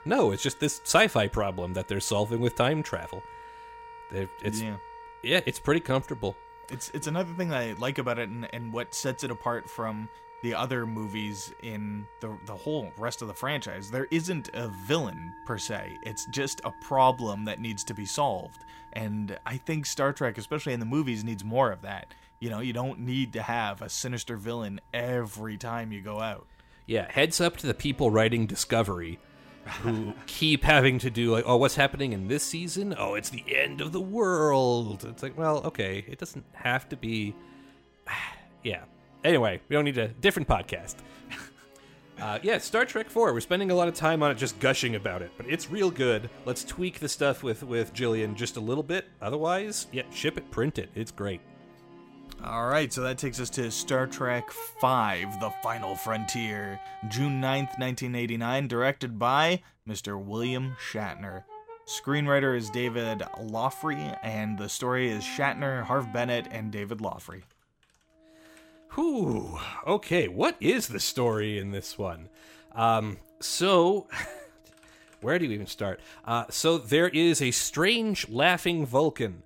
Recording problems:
background music; noticeable; throughout; 20 dB below the speech

